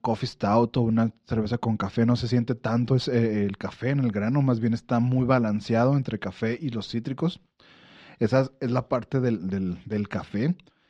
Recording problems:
muffled; slightly; fading above 3.5 kHz

